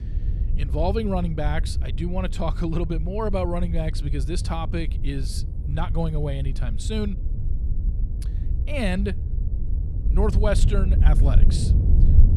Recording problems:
wind noise on the microphone; occasional gusts; 10 dB below the speech

